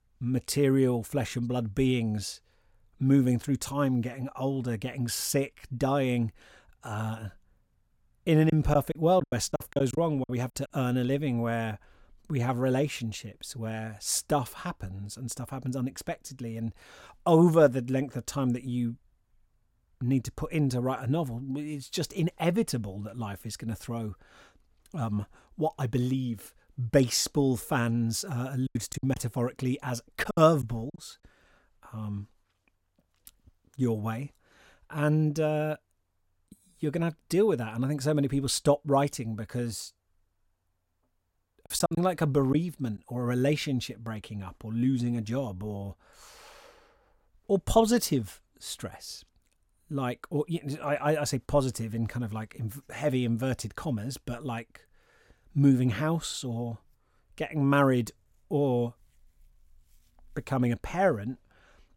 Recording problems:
choppy; very; from 8.5 to 10 s, from 29 to 31 s and from 42 to 43 s; 12% of the speech affected

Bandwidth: 16.5 kHz